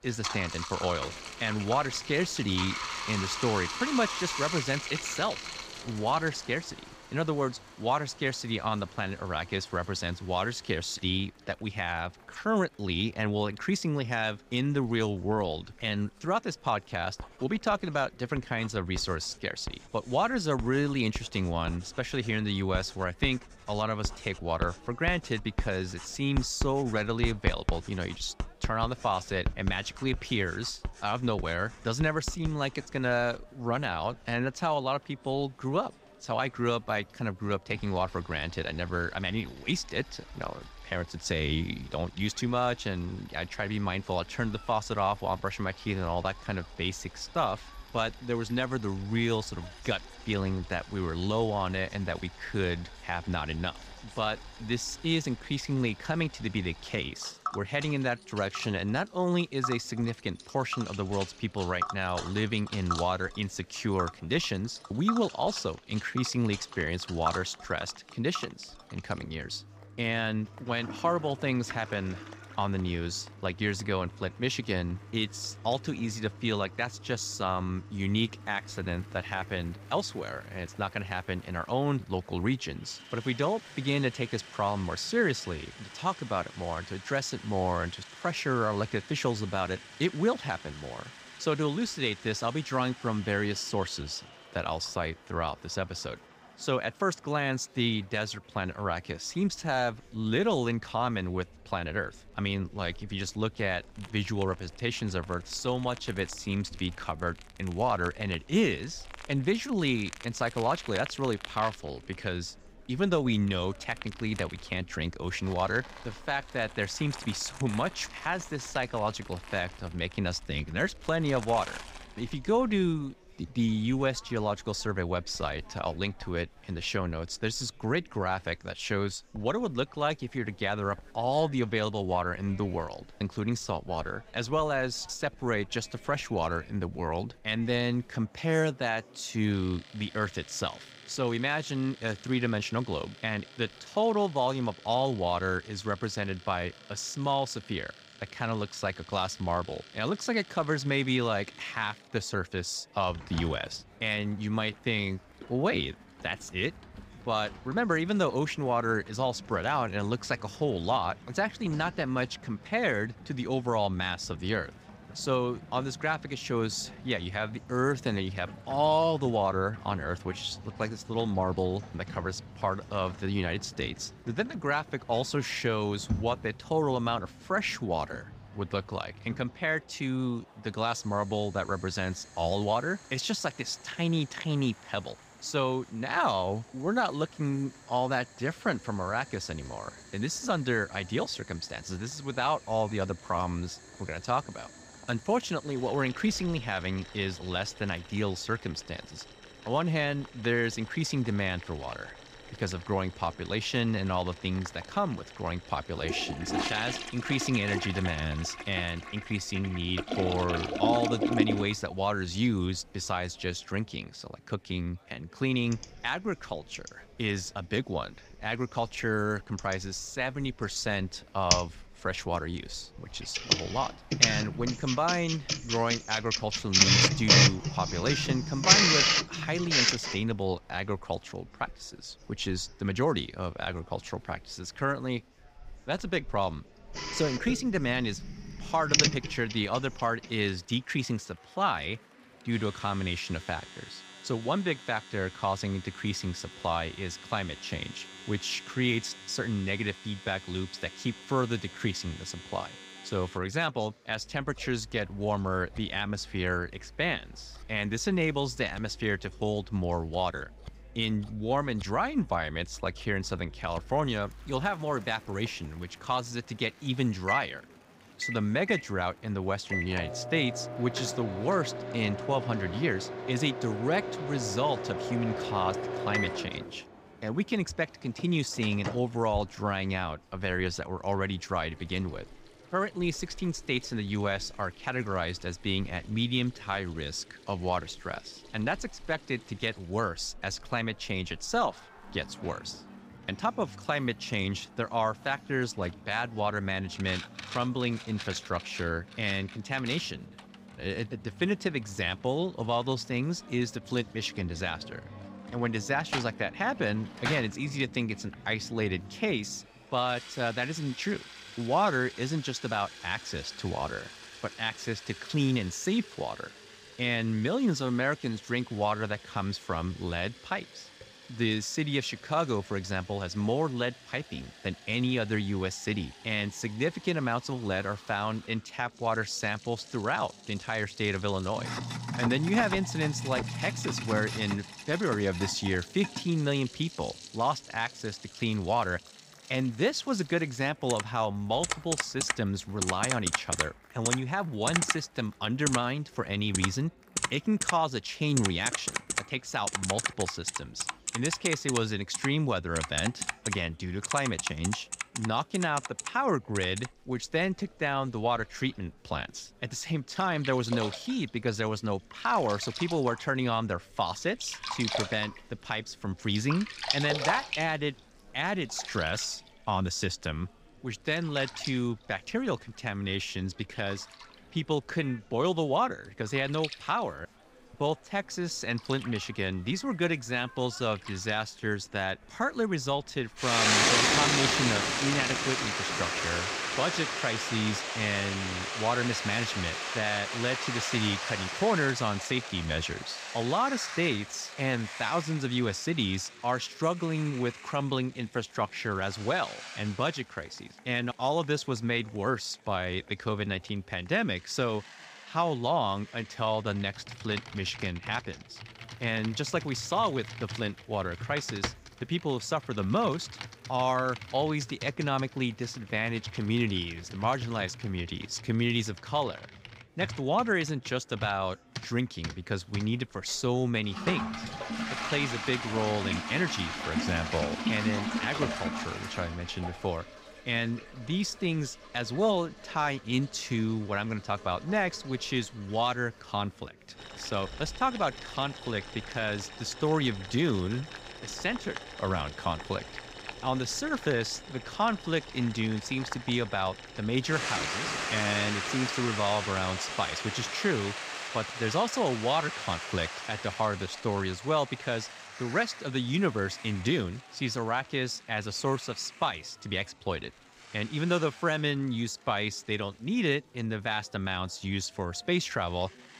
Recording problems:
household noises; loud; throughout; 3 dB below the speech
chatter from many people; faint; throughout; 25 dB below the speech

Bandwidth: 15.5 kHz